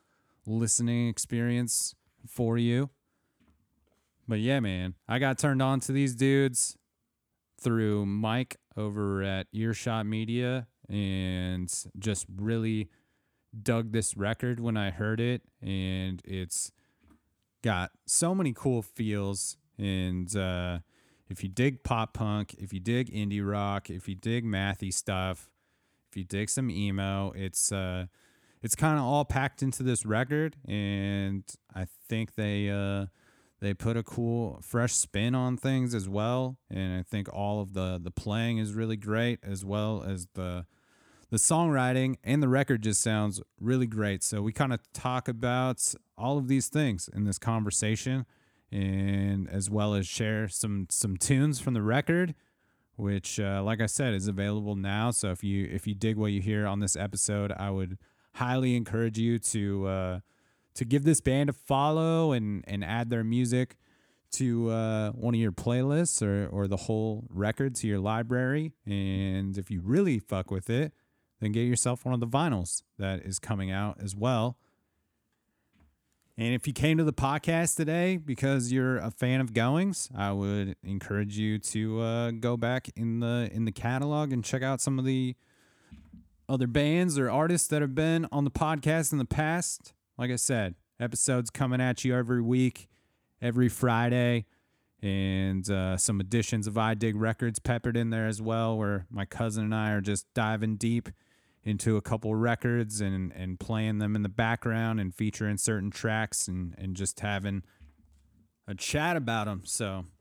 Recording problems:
none

